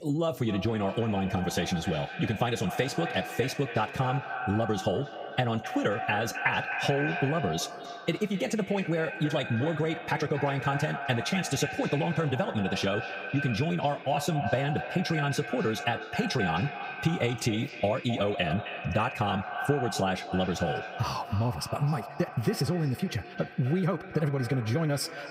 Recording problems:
echo of what is said; strong; throughout; 260 ms later, 7 dB below the speech
wrong speed, natural pitch; too fast; 1.5 times normal speed
squashed, flat; somewhat

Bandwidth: 15.5 kHz